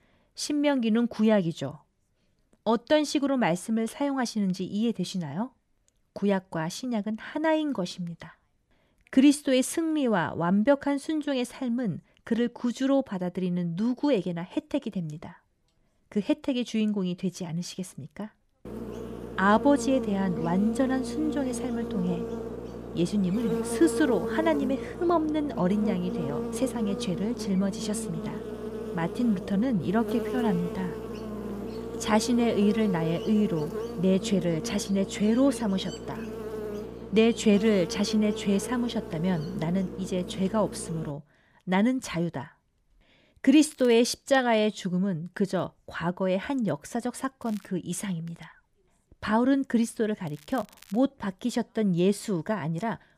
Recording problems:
electrical hum; loud; from 19 to 41 s; 60 Hz, 8 dB below the speech
crackling; faint; at 44 s, at 47 s and at 50 s; 25 dB below the speech

